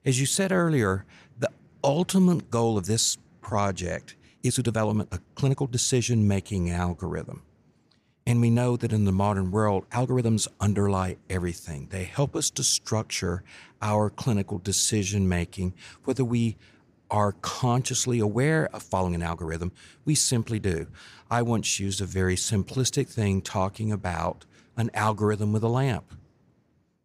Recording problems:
uneven, jittery; strongly; from 1.5 to 23 s

